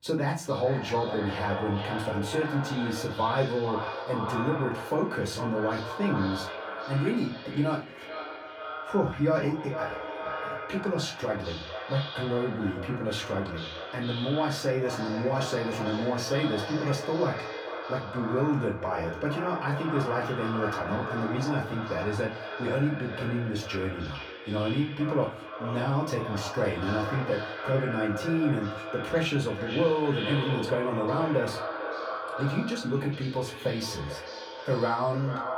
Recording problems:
echo of what is said; strong; throughout; 450 ms later, 6 dB below the speech
off-mic speech; far
room echo; very slight; dies away in 0.2 s

